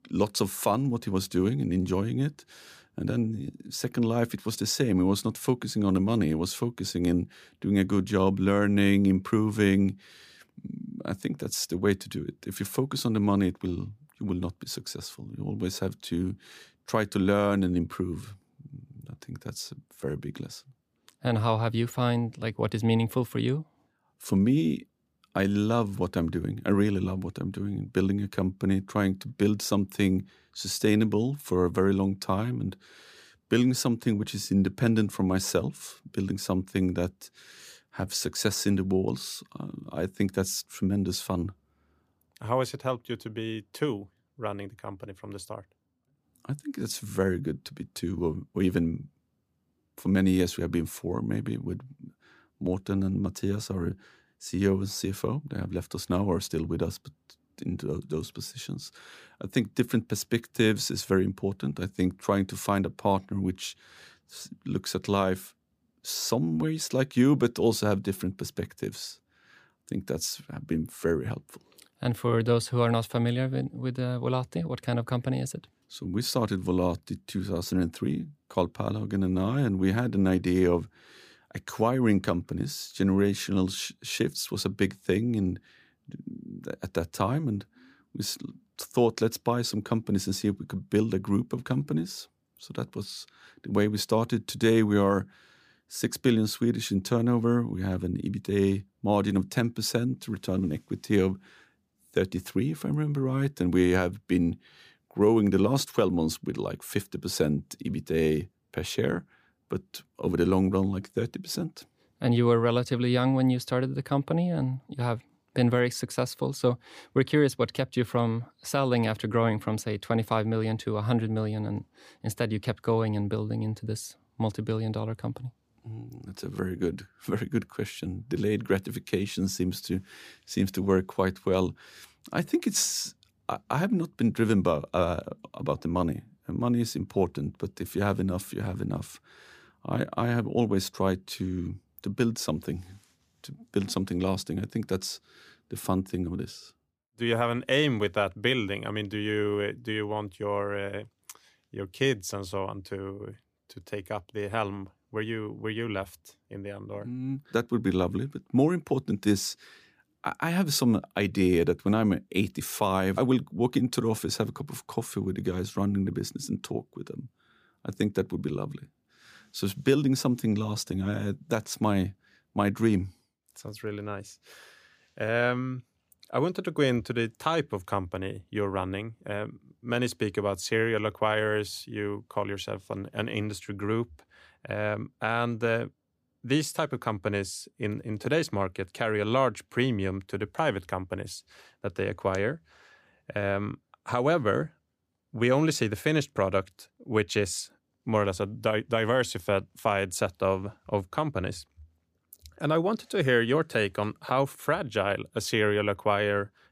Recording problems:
none

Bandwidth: 15 kHz